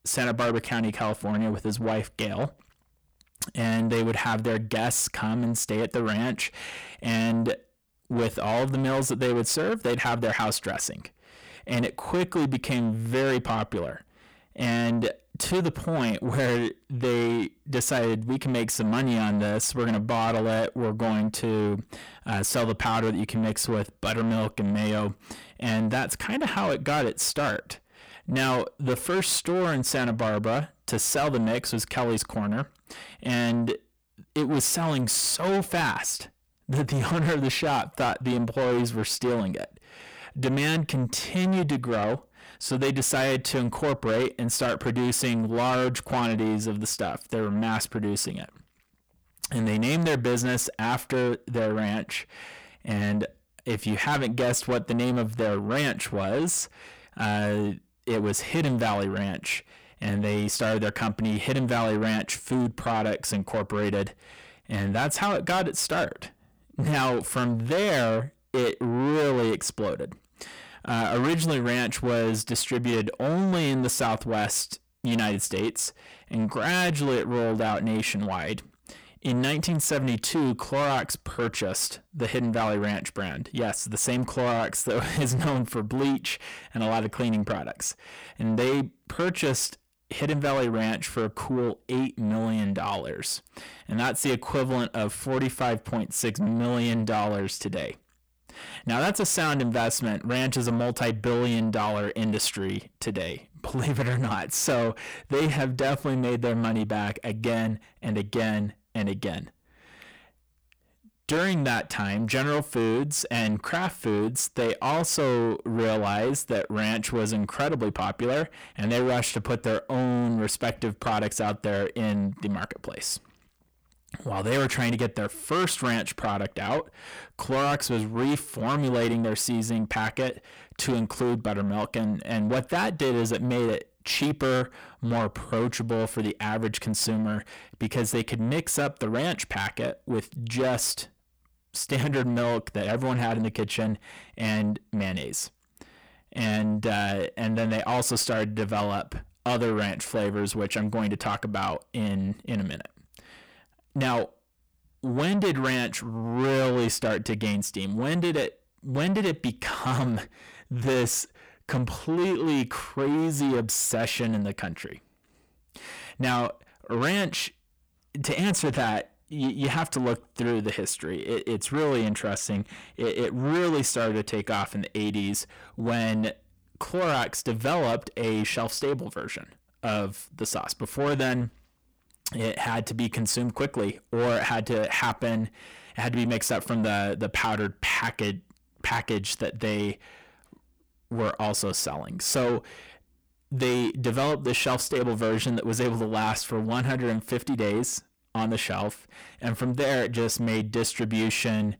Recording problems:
distortion; heavy; 7 dB below the speech

